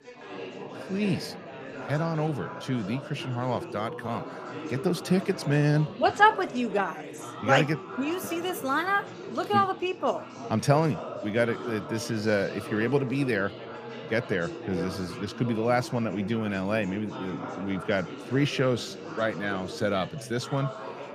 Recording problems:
chatter from many people; noticeable; throughout; 10 dB below the speech

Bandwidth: 15 kHz